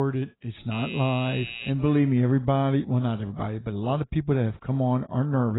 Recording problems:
garbled, watery; badly; nothing above 4 kHz
abrupt cut into speech; at the start and the end
doorbell; noticeable; from 0.5 to 1.5 s; peak 8 dB below the speech

